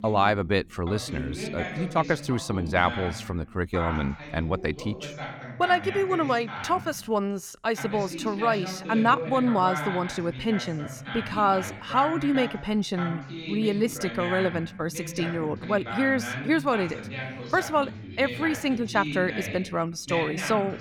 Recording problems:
voice in the background; loud; throughout; 8 dB below the speech

